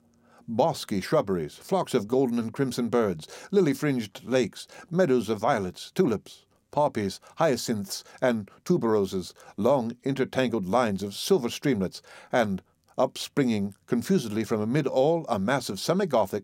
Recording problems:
uneven, jittery; slightly; from 2 to 10 s

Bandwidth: 16 kHz